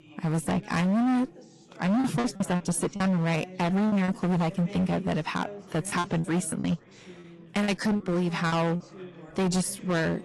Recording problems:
distortion; heavy; 21% of the sound clipped
garbled, watery; slightly; nothing above 10.5 kHz
background chatter; noticeable; throughout; 3 voices, 20 dB below the speech
choppy; very; from 2 to 4 s and from 6 to 9 s; 15% of the speech affected

